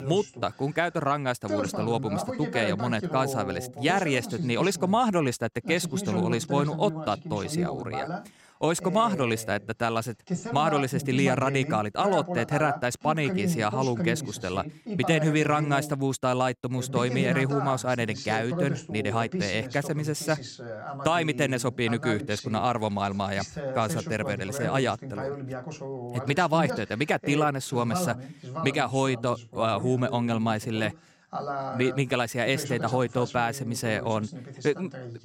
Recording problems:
voice in the background; loud; throughout; 7 dB below the speech

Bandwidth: 16 kHz